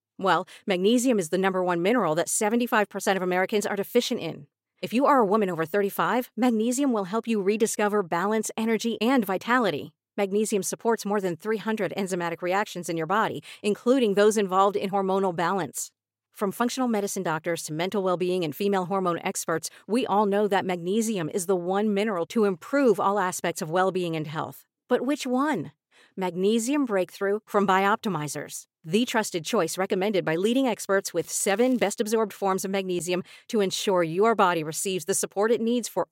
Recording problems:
crackling; faint; at 31 s; 25 dB below the speech

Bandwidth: 16 kHz